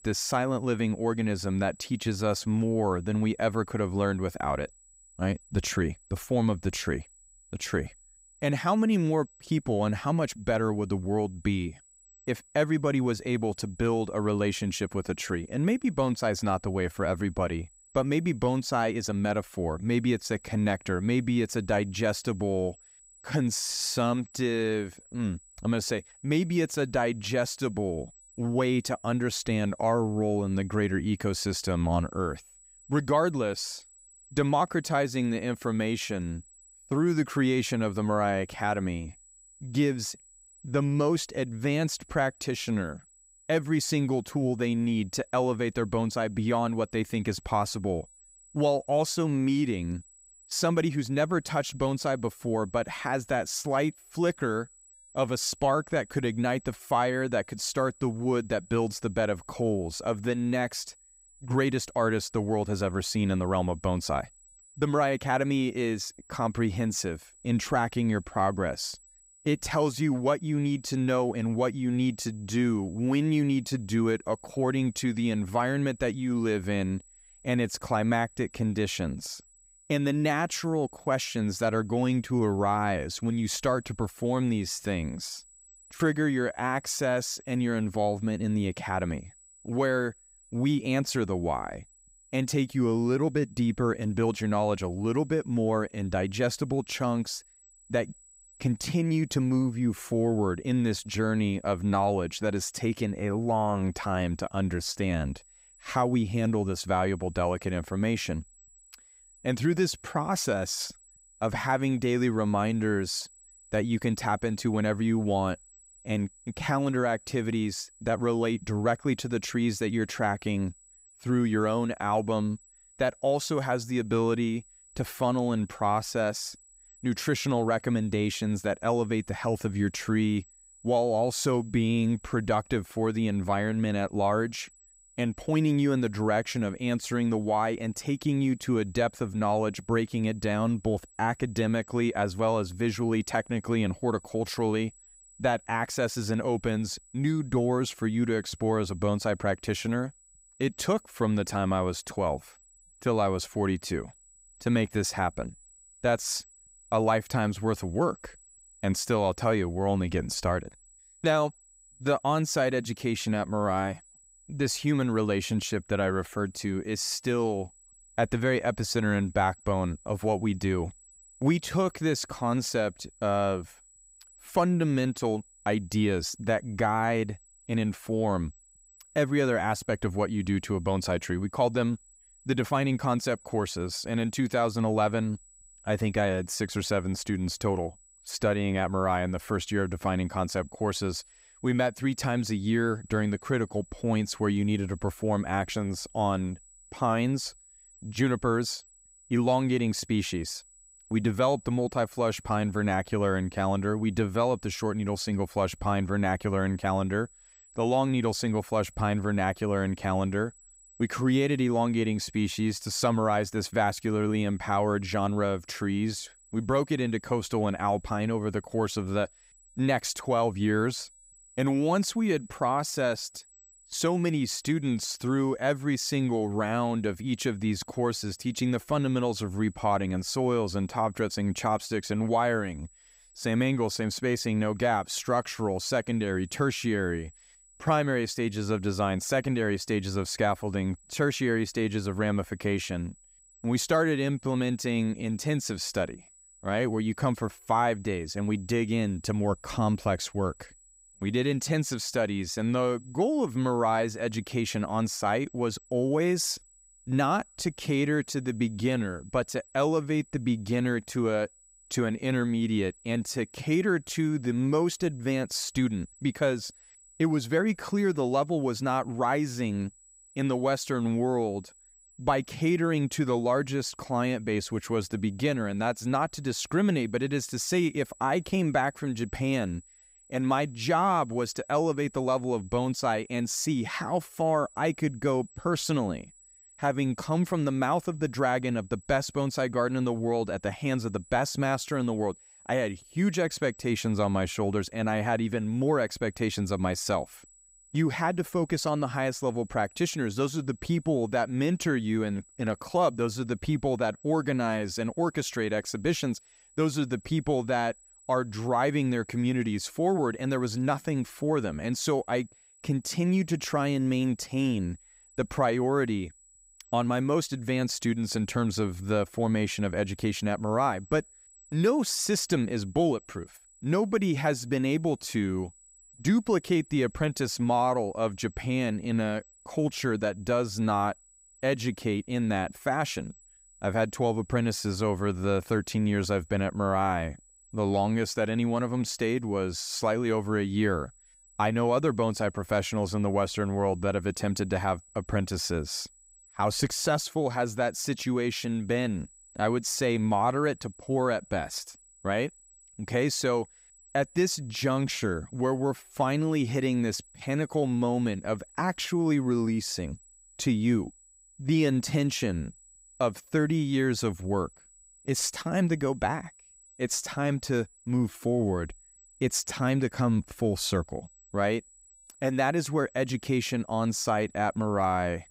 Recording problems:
high-pitched whine; faint; throughout; 8 kHz, 25 dB below the speech

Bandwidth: 15.5 kHz